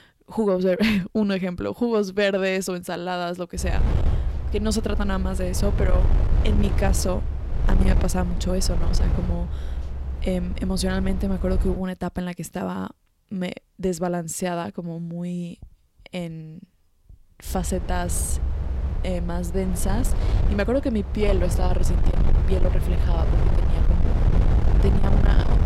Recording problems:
distortion; slight; 10 dB below the speech
low rumble; loud; from 3.5 to 12 s and from 17 s on; 8 dB below the speech

